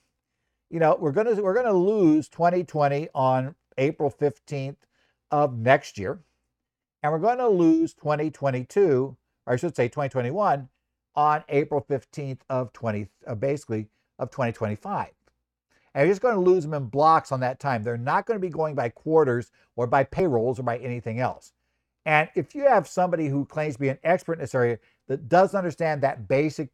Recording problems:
none

